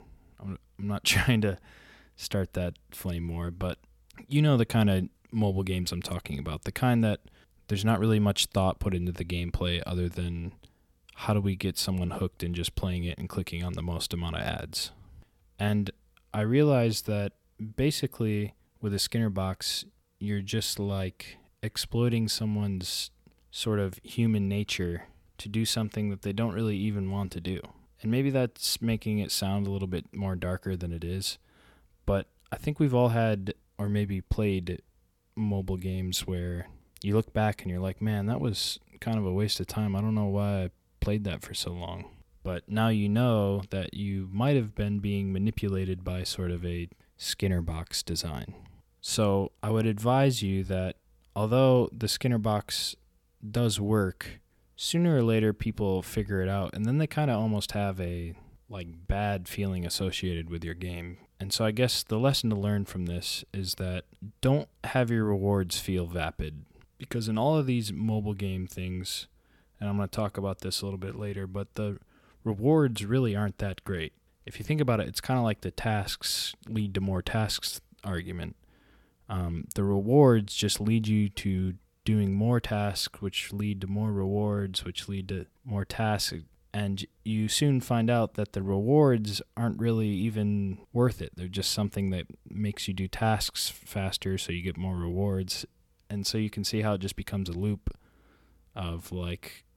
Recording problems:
none

